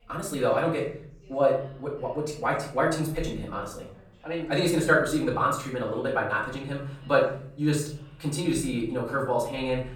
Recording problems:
off-mic speech; far
wrong speed, natural pitch; too fast; 1.5 times normal speed
room echo; slight; dies away in 0.6 s
background chatter; faint; throughout; 2 voices, 30 dB below the speech

